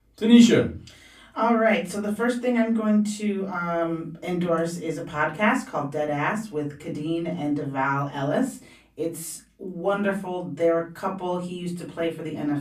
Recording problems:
off-mic speech; far
room echo; very slight; dies away in 0.3 s

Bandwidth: 15 kHz